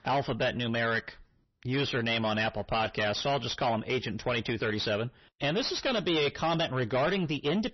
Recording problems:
distortion; heavy; 5 dB below the speech
garbled, watery; slightly; nothing above 6 kHz

